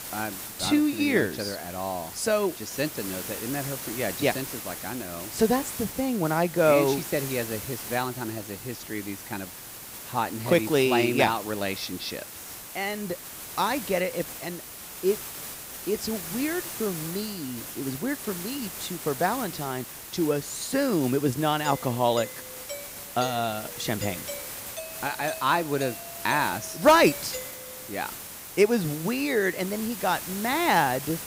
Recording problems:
hiss; loud; throughout; 9 dB below the speech
doorbell; noticeable; from 22 to 28 s; peak 10 dB below the speech

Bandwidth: 15.5 kHz